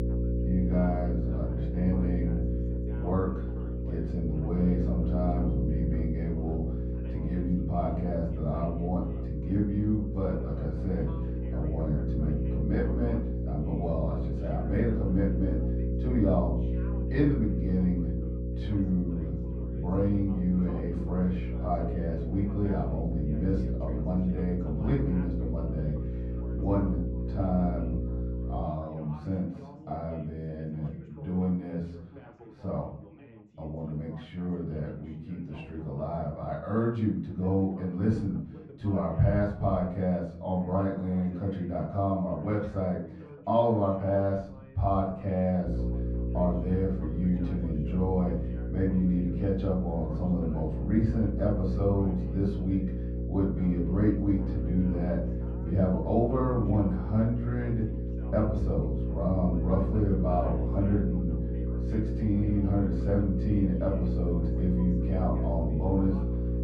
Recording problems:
off-mic speech; far
muffled; very; fading above 3.5 kHz
room echo; slight; dies away in 0.6 s
electrical hum; loud; until 29 s and from 46 s on; 60 Hz, 7 dB below the speech
background chatter; noticeable; throughout; 3 voices, 20 dB below the speech

